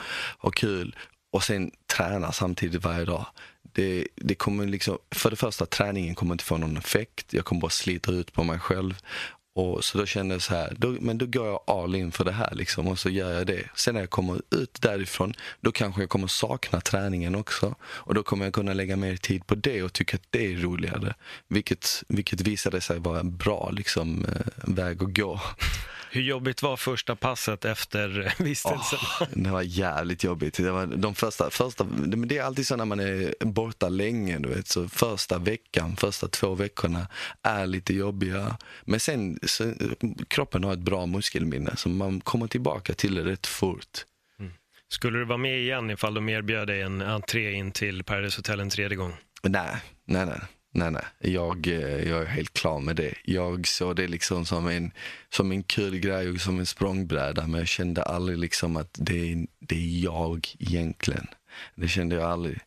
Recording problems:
squashed, flat; heavily

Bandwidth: 14 kHz